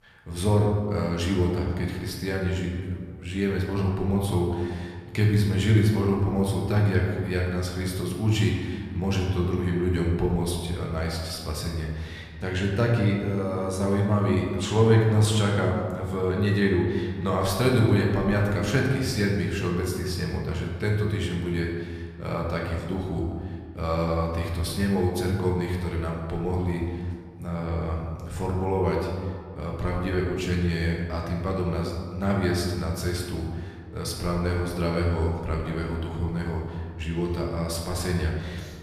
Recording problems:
room echo; noticeable; dies away in 1.6 s
off-mic speech; somewhat distant

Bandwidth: 14.5 kHz